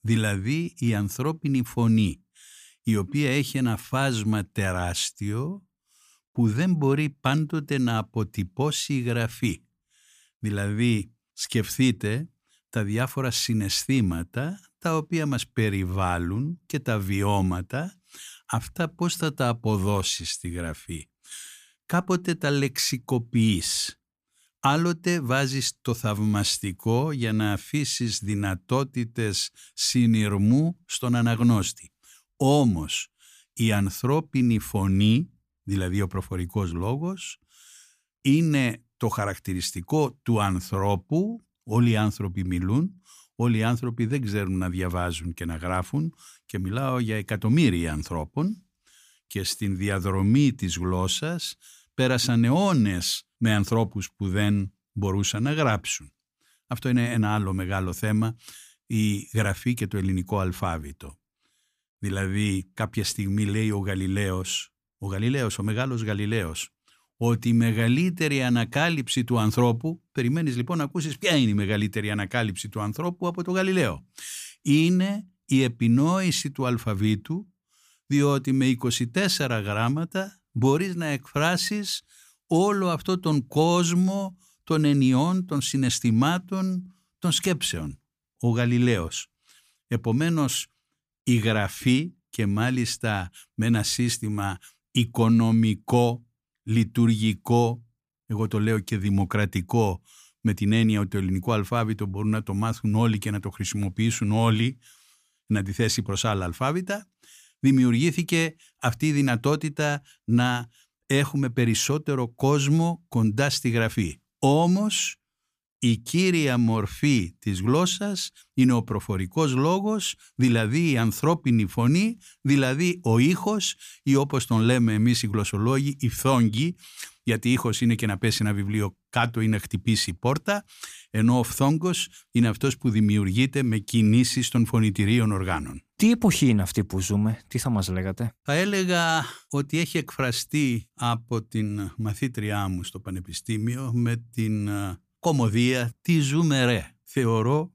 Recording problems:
none

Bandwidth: 15 kHz